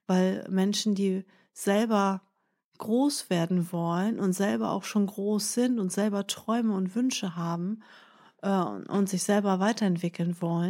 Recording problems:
abrupt cut into speech; at the end

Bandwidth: 16 kHz